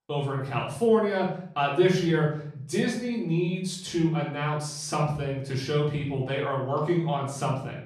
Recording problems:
off-mic speech; far
room echo; noticeable; dies away in 0.6 s

